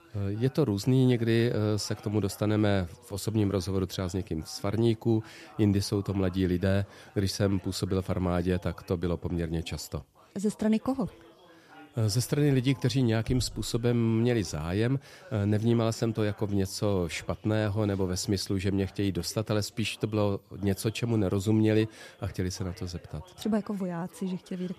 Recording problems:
background chatter; faint; throughout; 2 voices, 25 dB below the speech

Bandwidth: 14.5 kHz